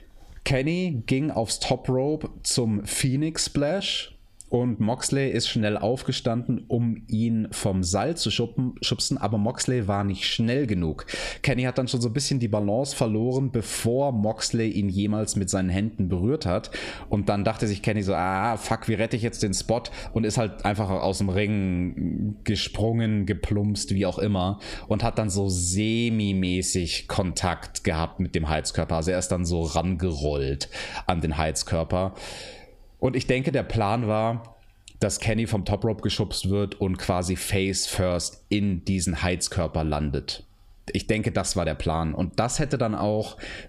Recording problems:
squashed, flat; somewhat

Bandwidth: 15 kHz